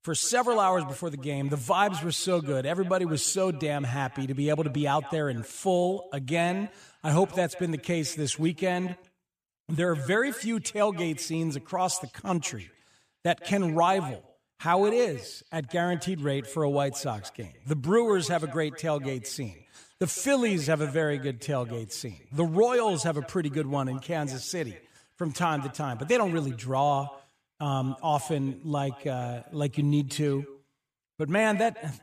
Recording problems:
echo of what is said; faint; throughout; 150 ms later, 20 dB below the speech

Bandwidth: 15 kHz